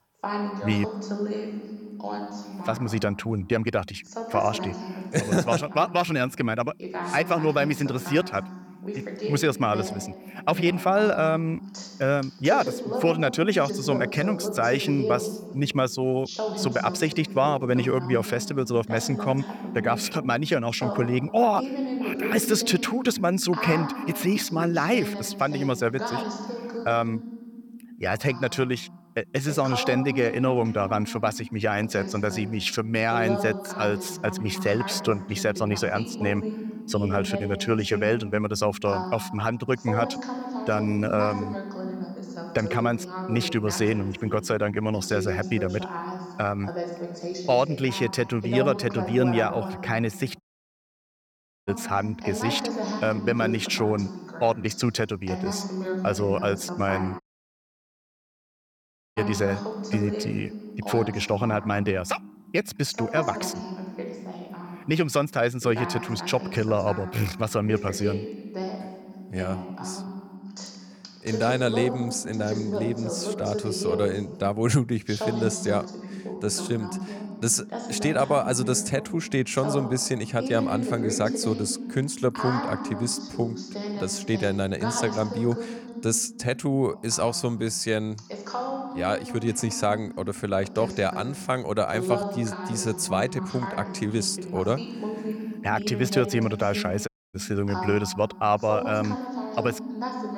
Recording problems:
voice in the background; loud; throughout; 7 dB below the speech
audio cutting out; at 50 s for 1.5 s, at 57 s for 2 s and at 1:37

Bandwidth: 18 kHz